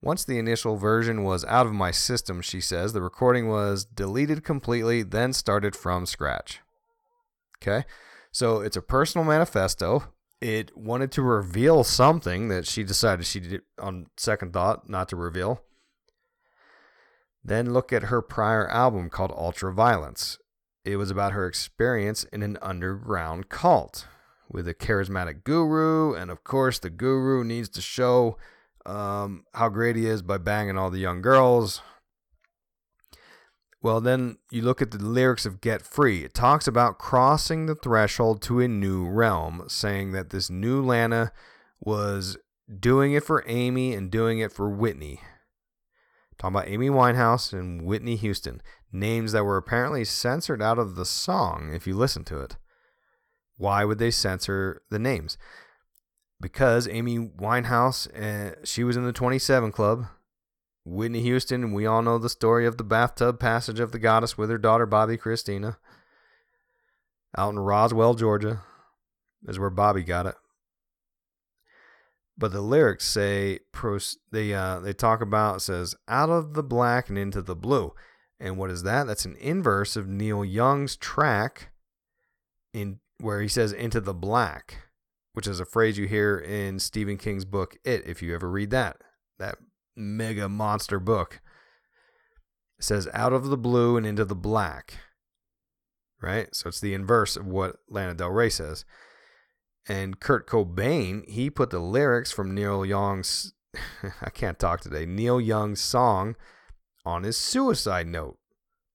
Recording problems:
none

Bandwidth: 18.5 kHz